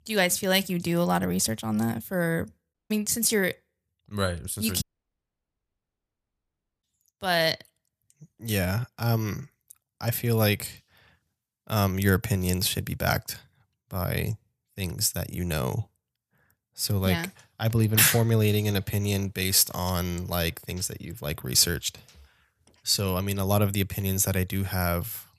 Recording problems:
audio cutting out; at 2.5 s and at 5 s for 2 s

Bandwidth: 14.5 kHz